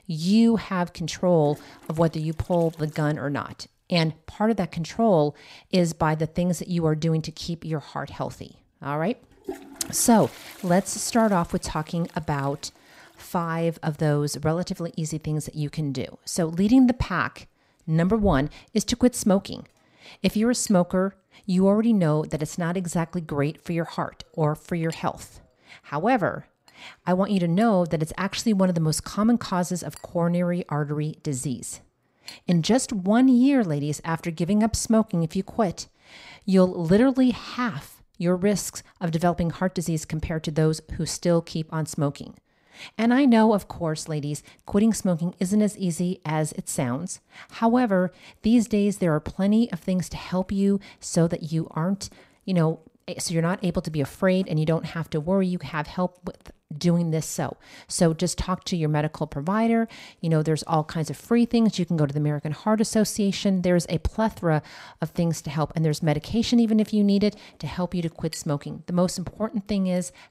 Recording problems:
household noises; faint; throughout; 25 dB below the speech

